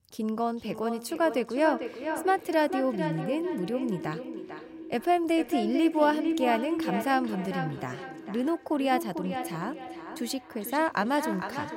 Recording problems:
echo of what is said; strong; throughout; 450 ms later, 7 dB below the speech

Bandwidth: 16 kHz